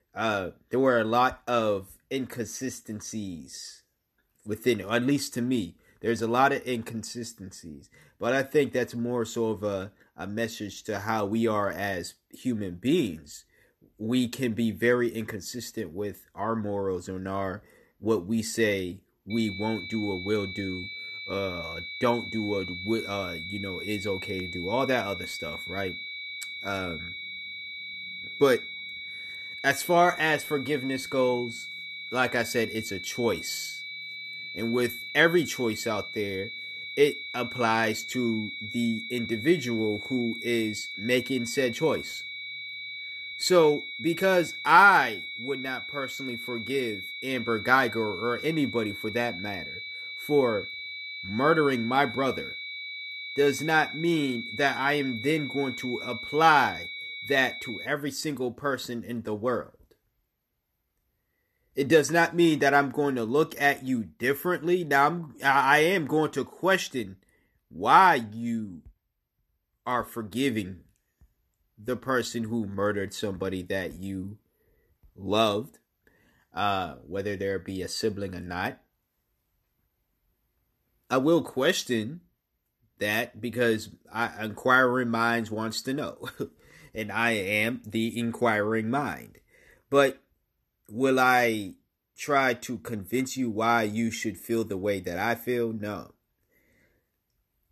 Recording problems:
high-pitched whine; loud; from 19 to 58 s; 2.5 kHz, 9 dB below the speech

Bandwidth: 13.5 kHz